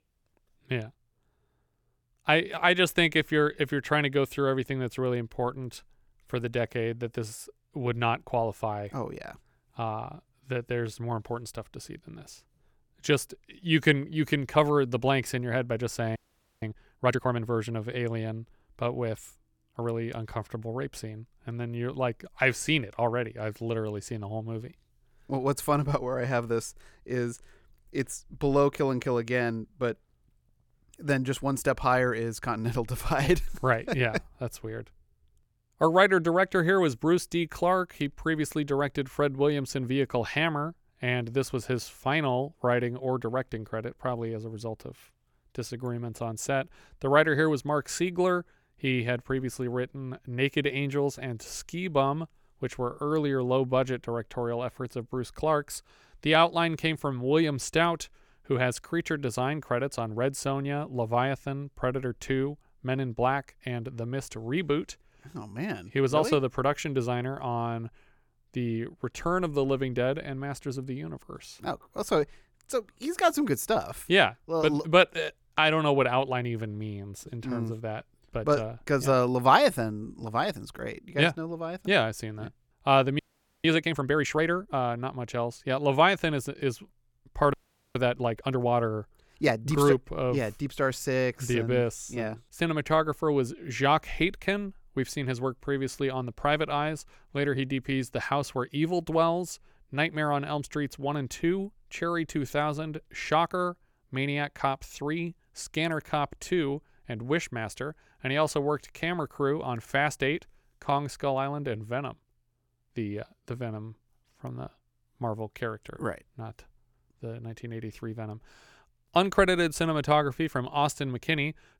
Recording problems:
audio freezing; at 16 s, at 1:23 and at 1:28

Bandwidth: 18 kHz